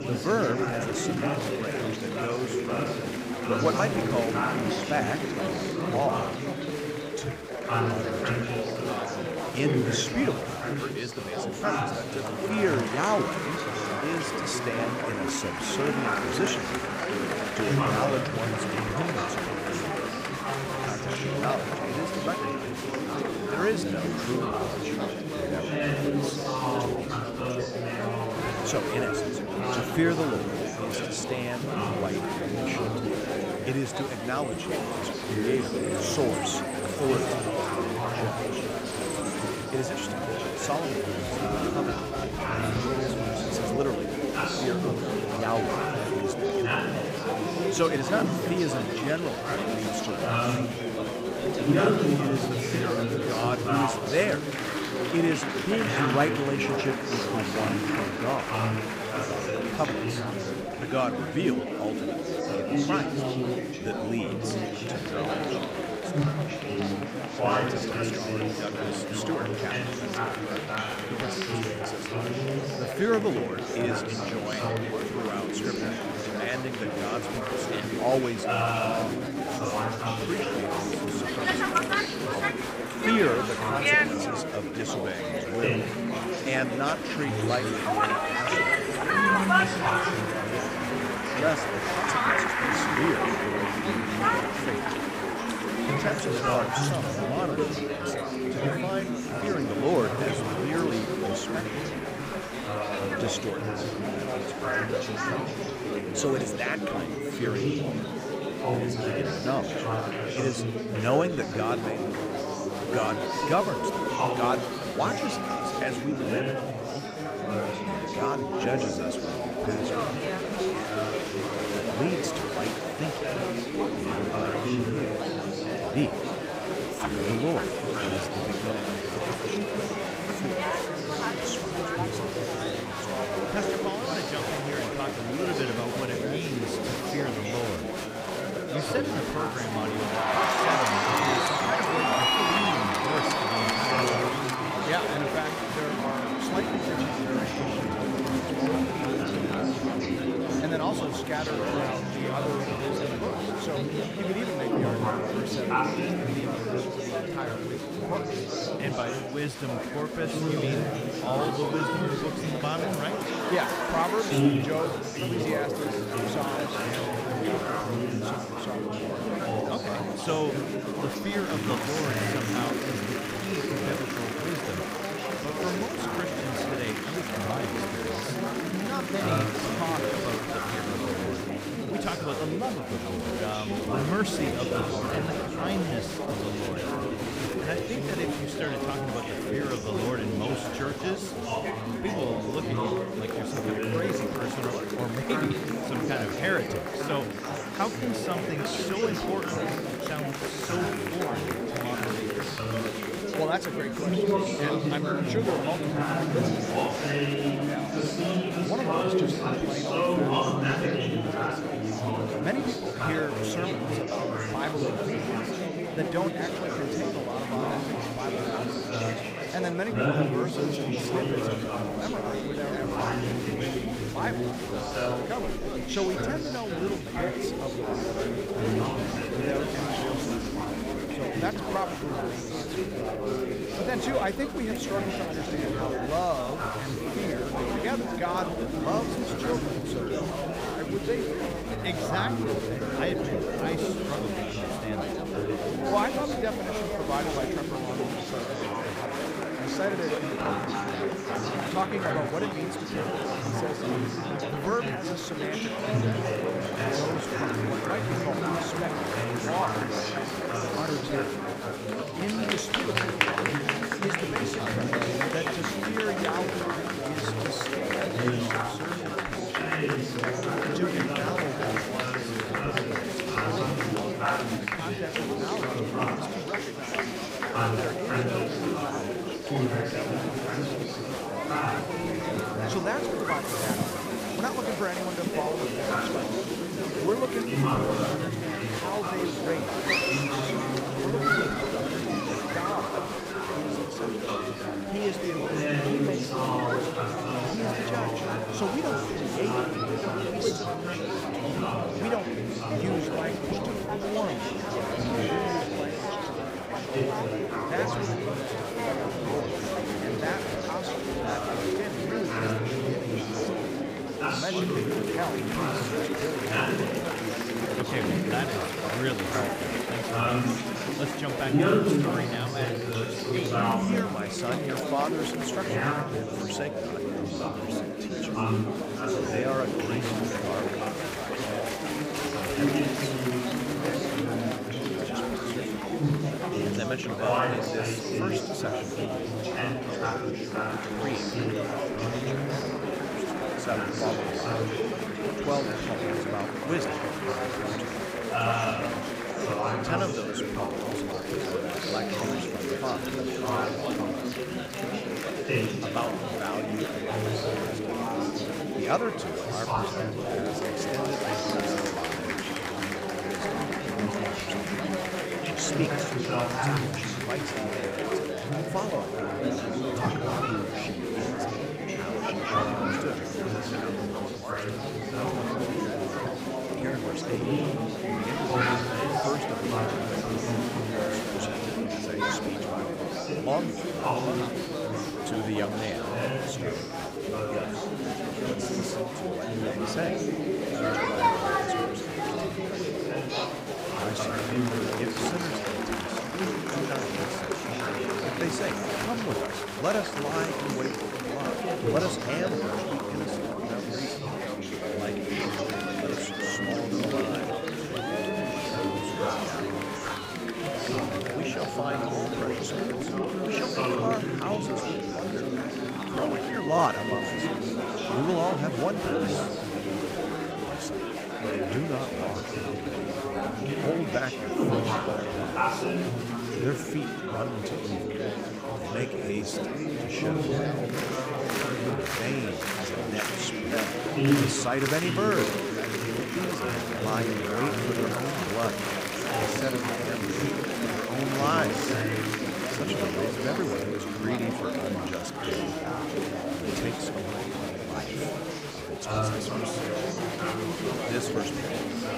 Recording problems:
chatter from many people; very loud; throughout; 5 dB above the speech

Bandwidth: 15.5 kHz